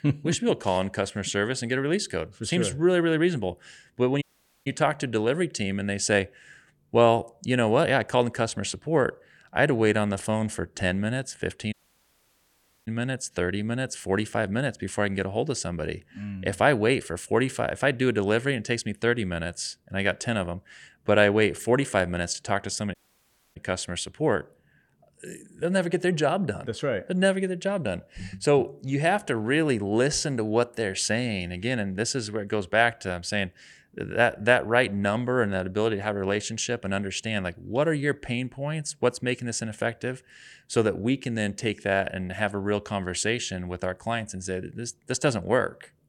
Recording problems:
audio cutting out; at 4 s, at 12 s for 1 s and at 23 s for 0.5 s

